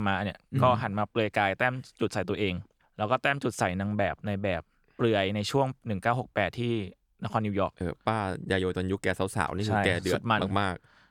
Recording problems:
abrupt cut into speech; at the start

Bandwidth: 18.5 kHz